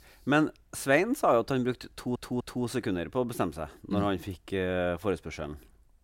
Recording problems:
audio stuttering; at 2 s

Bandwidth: 16 kHz